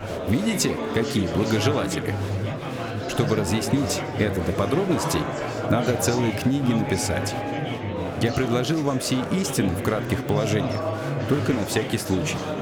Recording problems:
murmuring crowd; loud; throughout; 3 dB below the speech

